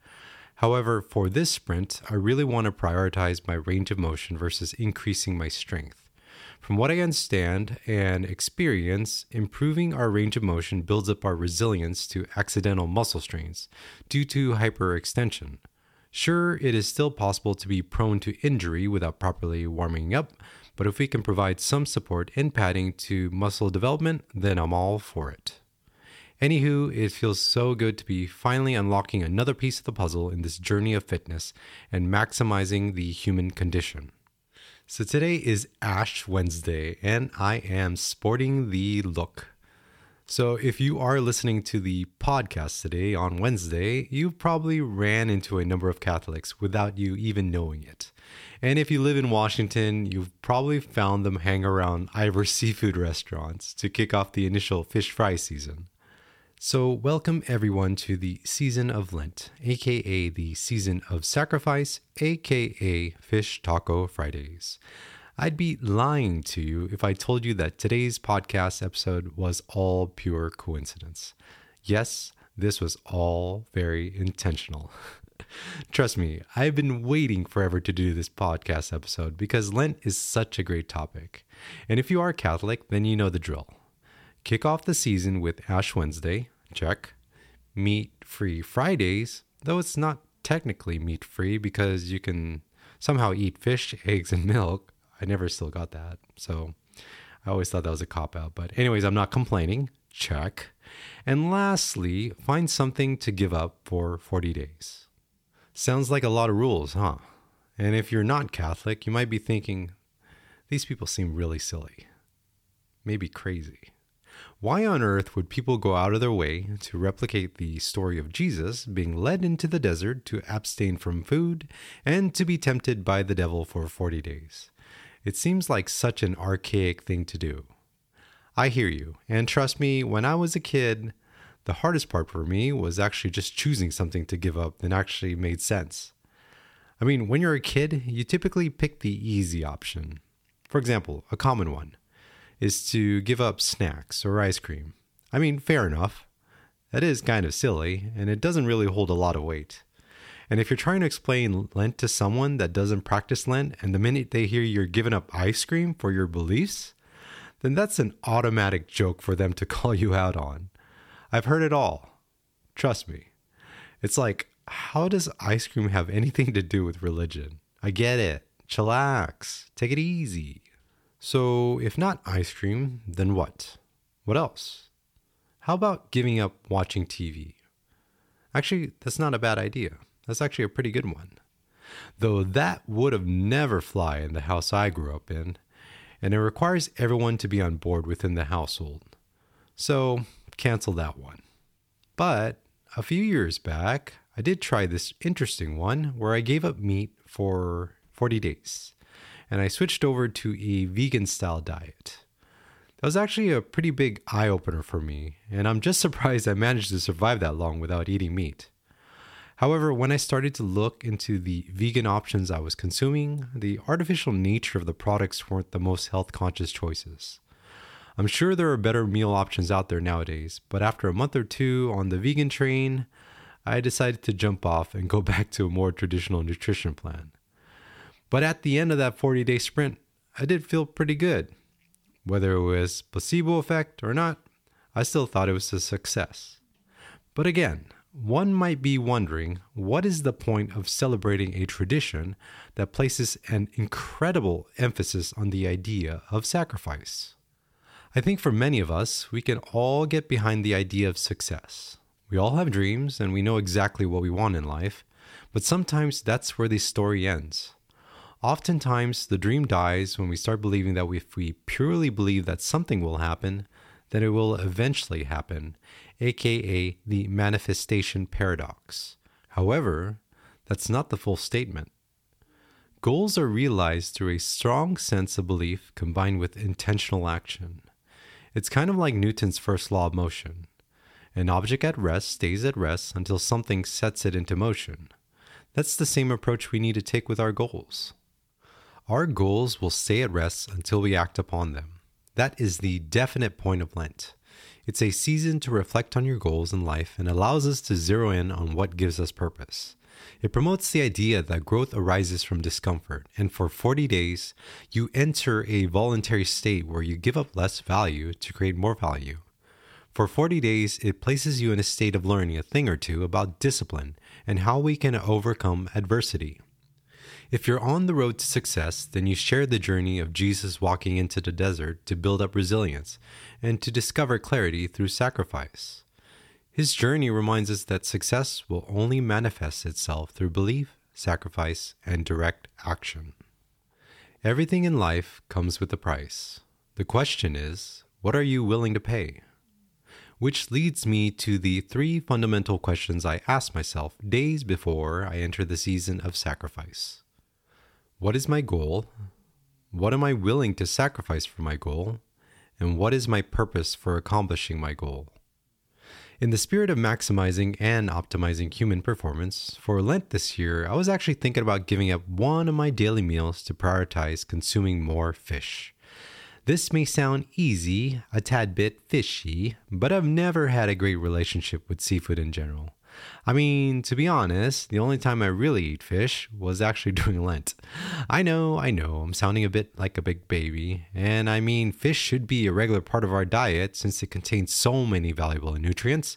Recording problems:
none

